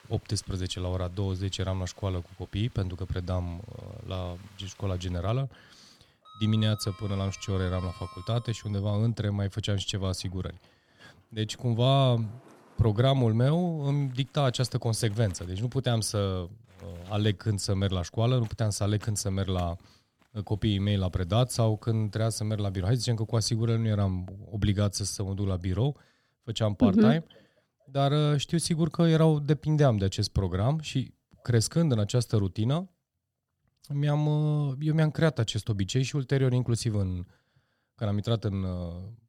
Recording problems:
household noises; faint; until 24 s; 25 dB below the speech

